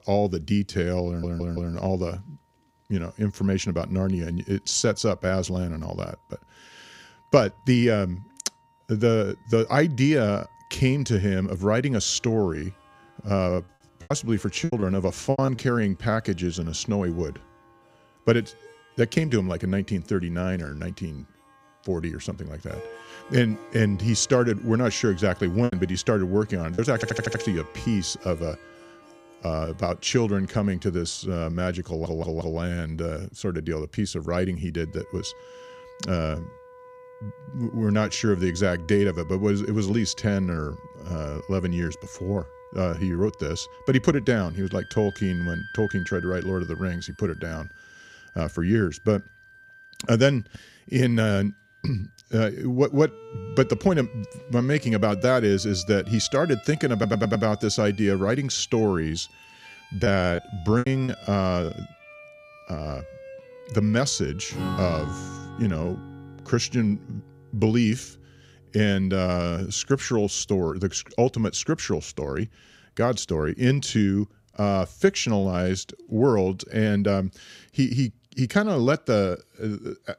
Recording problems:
background music; noticeable; throughout; 20 dB below the speech
audio stuttering; 4 times, first at 1 s
choppy; very; from 13 to 16 s, from 26 to 27 s and from 1:00 to 1:01; 14% of the speech affected

